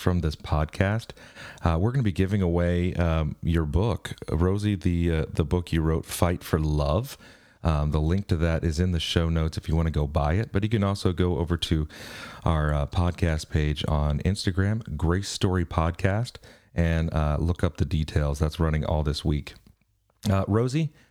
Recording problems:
squashed, flat; somewhat

